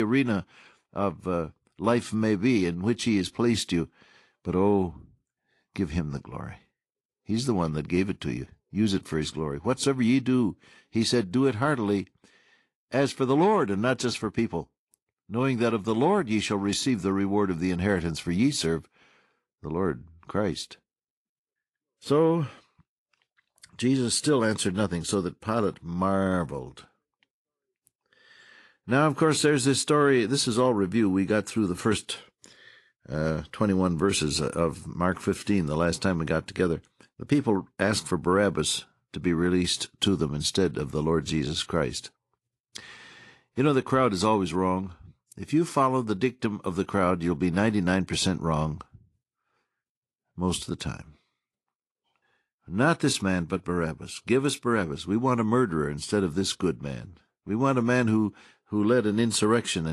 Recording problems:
garbled, watery; slightly; nothing above 11 kHz
abrupt cut into speech; at the start and the end

